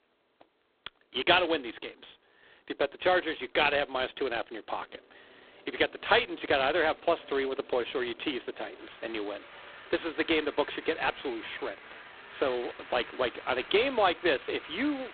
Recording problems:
phone-call audio; poor line; nothing above 4 kHz
traffic noise; noticeable; throughout; 20 dB below the speech

